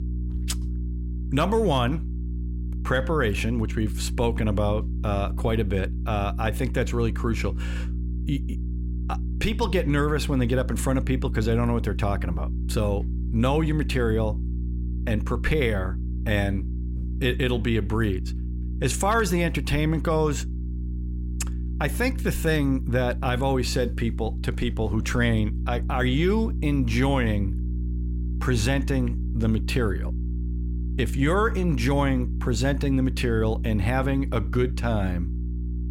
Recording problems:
electrical hum; noticeable; throughout; 60 Hz, 15 dB below the speech

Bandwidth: 16 kHz